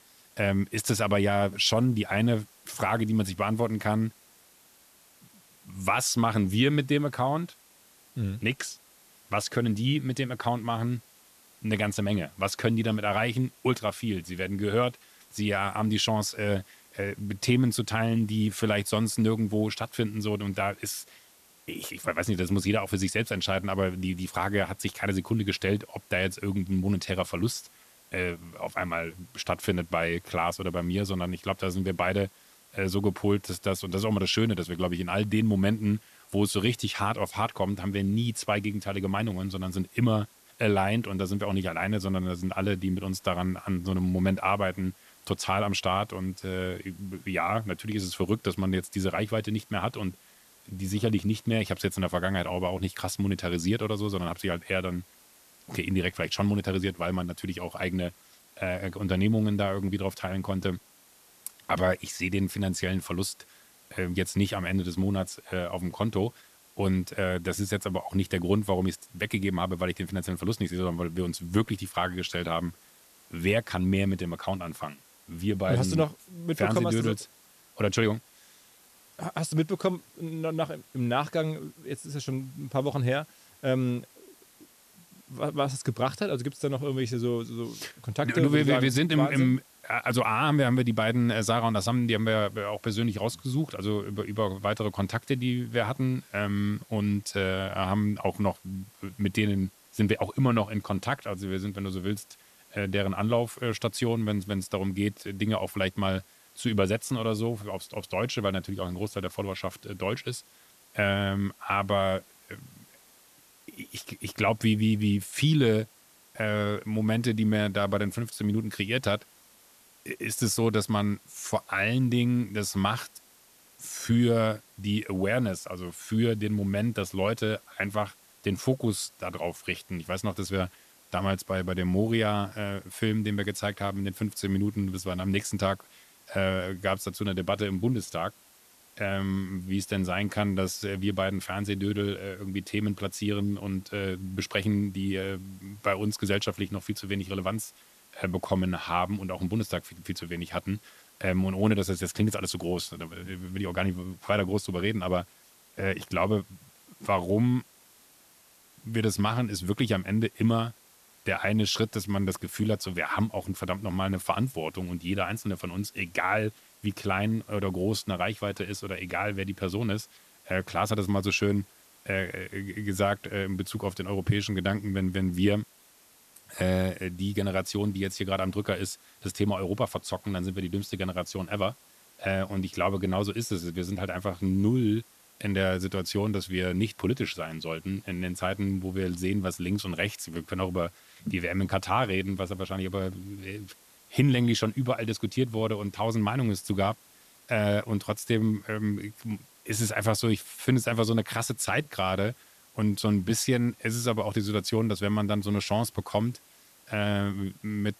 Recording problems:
hiss; faint; throughout; 25 dB below the speech

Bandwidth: 14 kHz